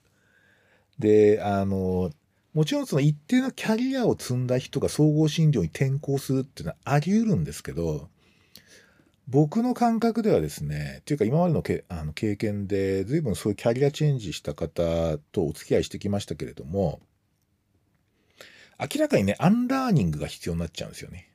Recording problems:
none

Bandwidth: 15 kHz